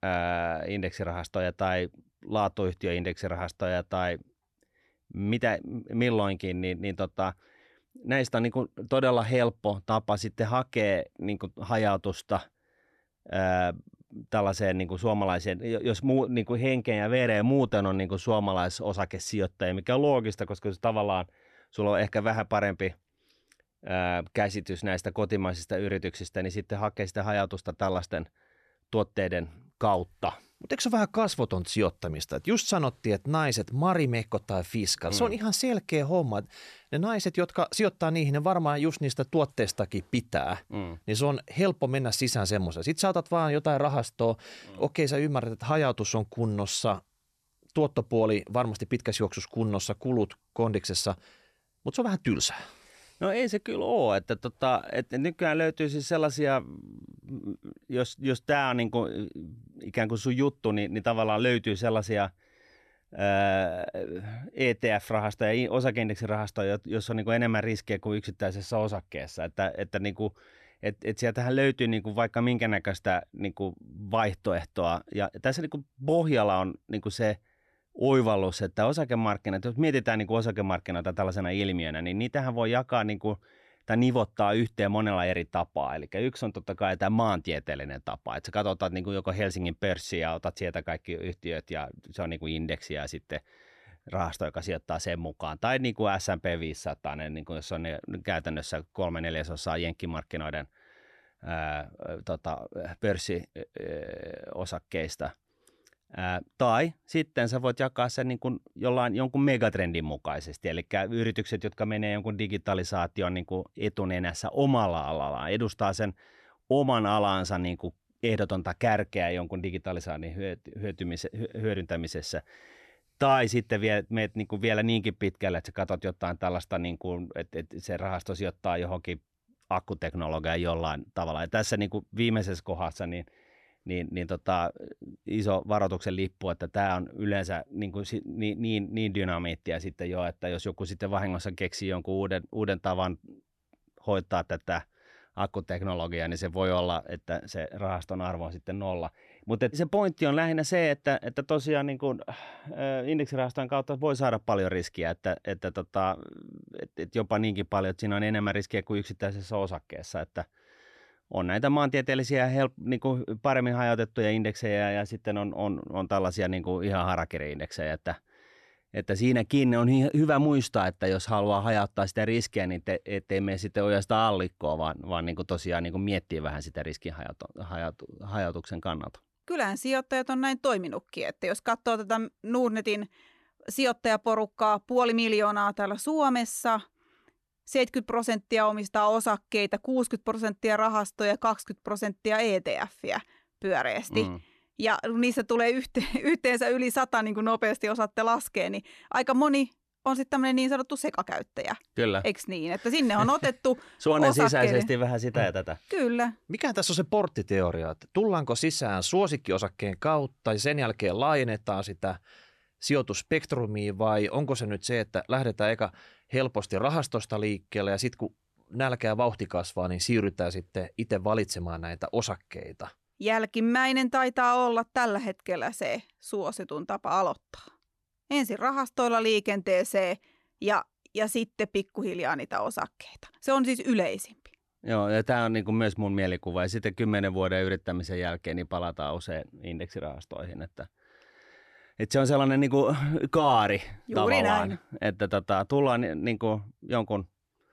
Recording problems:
none

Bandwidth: 13.5 kHz